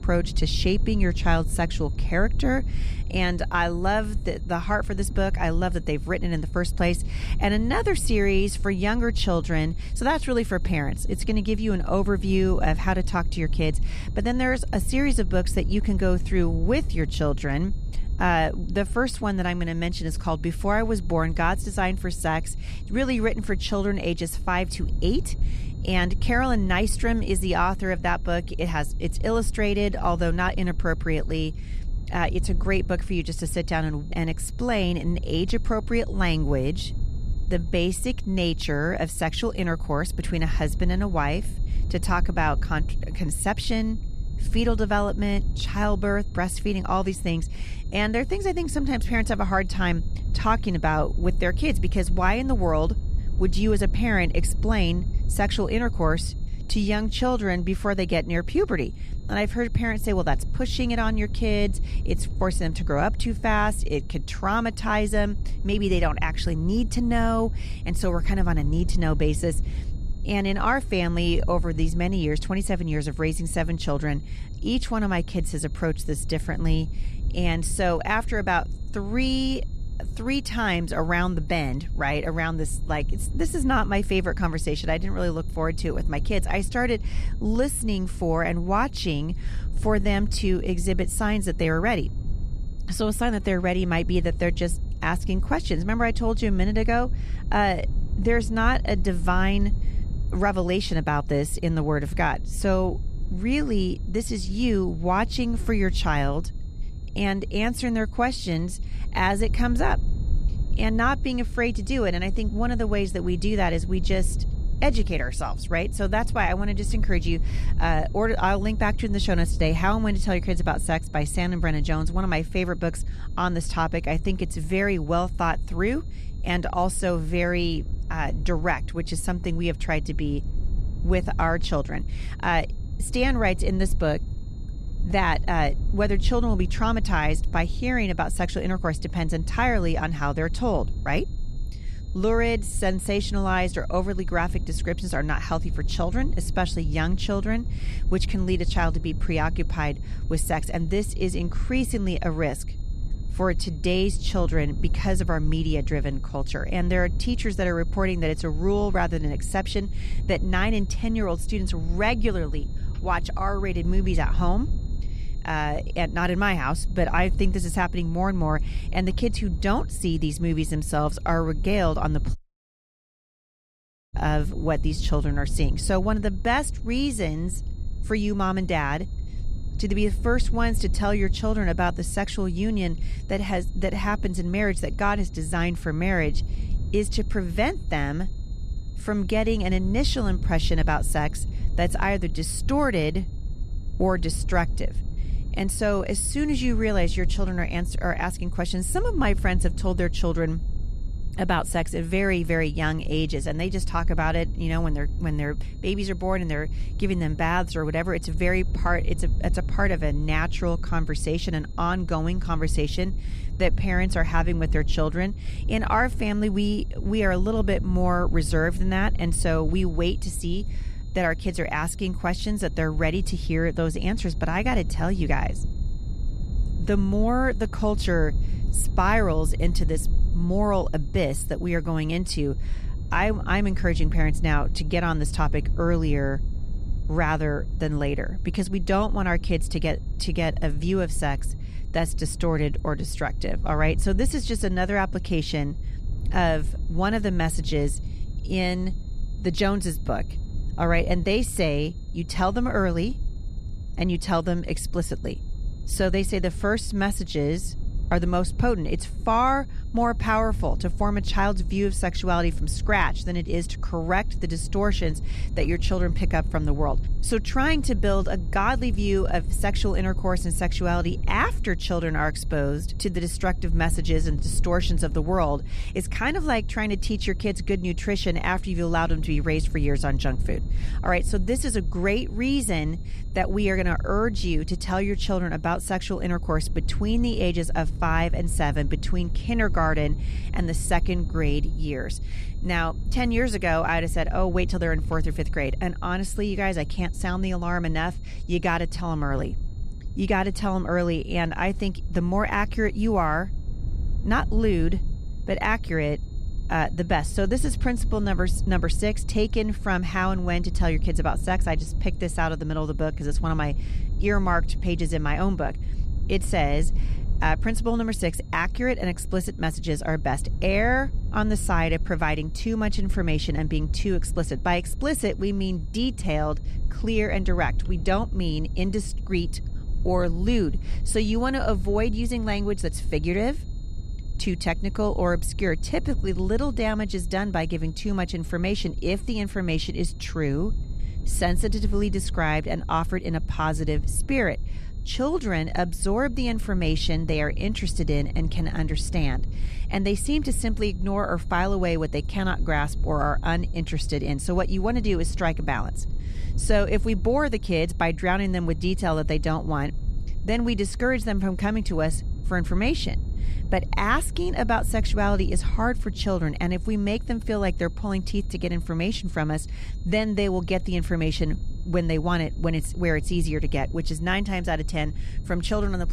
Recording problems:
high-pitched whine; faint; throughout; 4 kHz, 30 dB below the speech
low rumble; faint; throughout; 20 dB below the speech
audio cutting out; at 2:52 for 2 s

